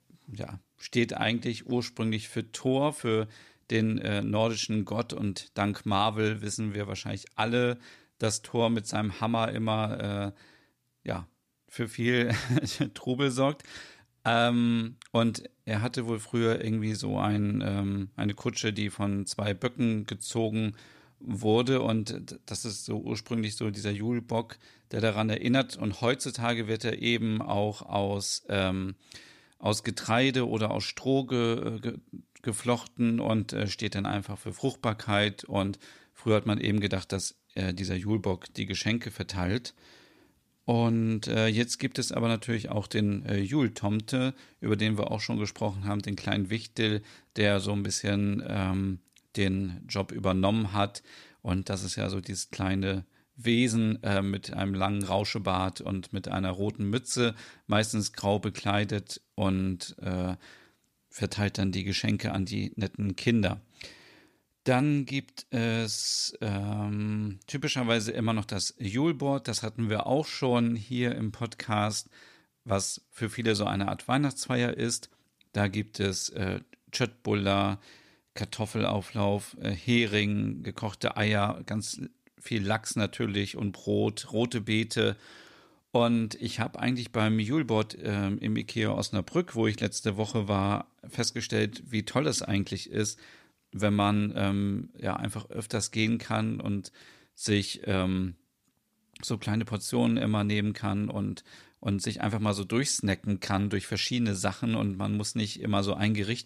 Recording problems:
none

